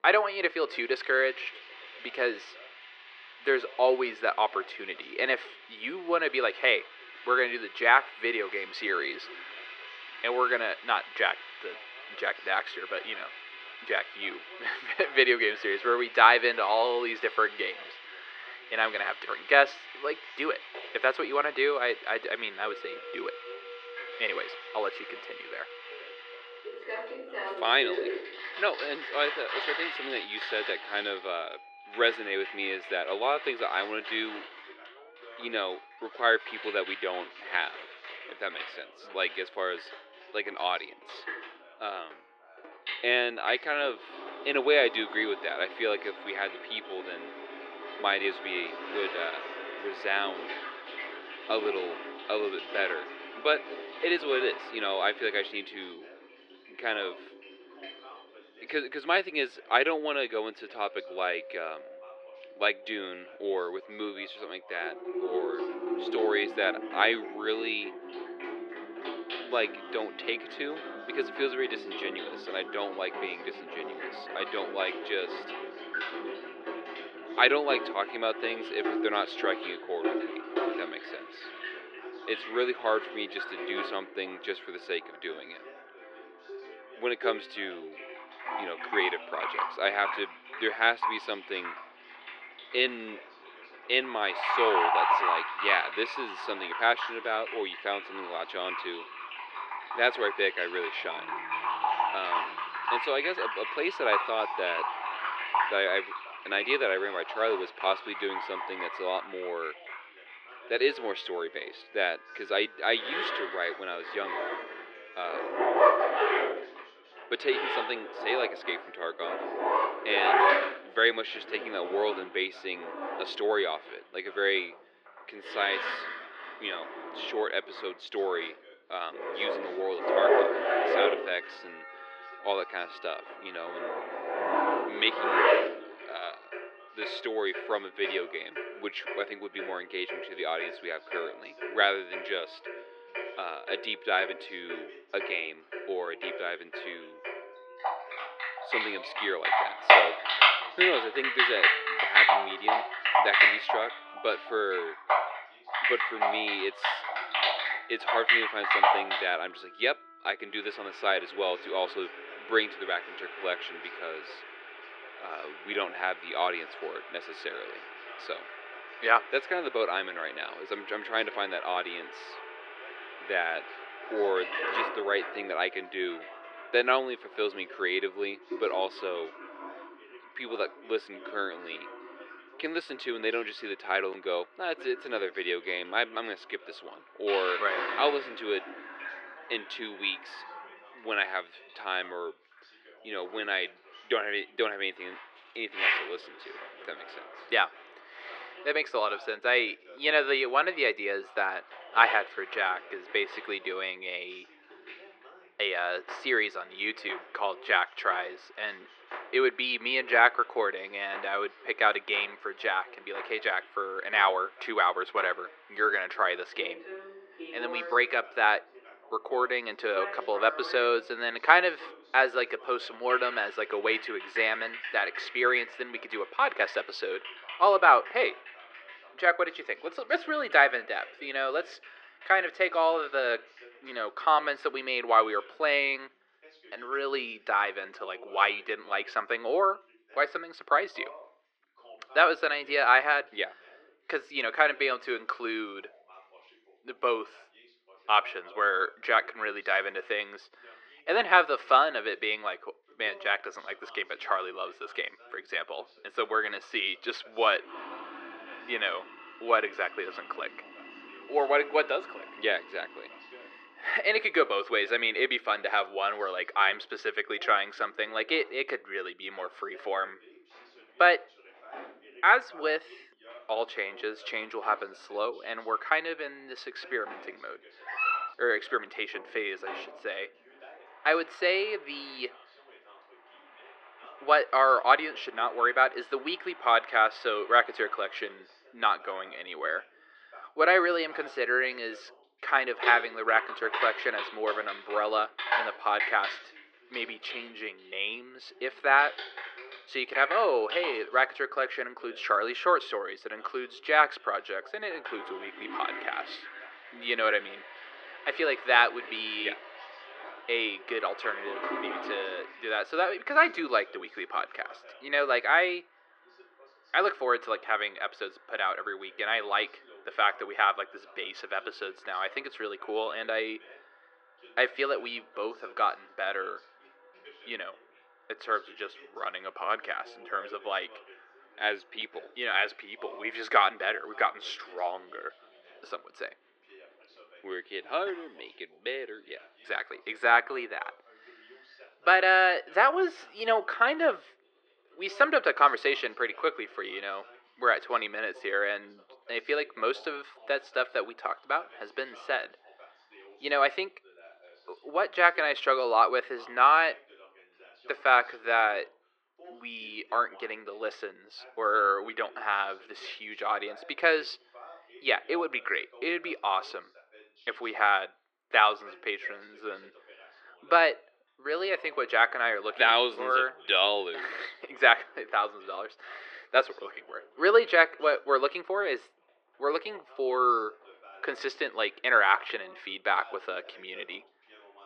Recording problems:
thin; very; fading below 350 Hz
muffled; slightly; fading above 3.5 kHz
household noises; loud; throughout; 5 dB below the speech
background music; faint; until 2:58; 20 dB below the speech
voice in the background; faint; throughout; 25 dB below the speech
dog barking; loud; at 4:38; peak 1 dB above the speech

